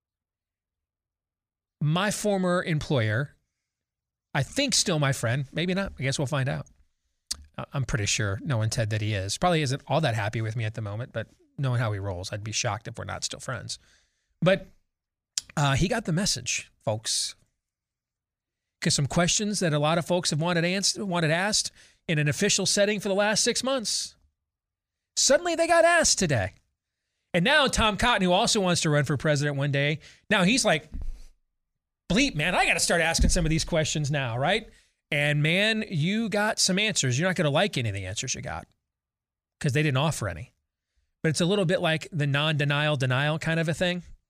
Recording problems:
none

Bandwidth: 15 kHz